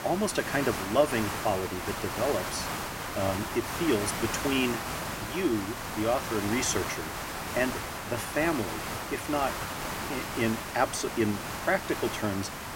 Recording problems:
hiss; loud; throughout; 3 dB below the speech

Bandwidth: 16 kHz